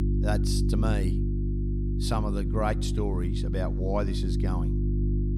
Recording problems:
electrical hum; loud; throughout; 50 Hz, 5 dB below the speech

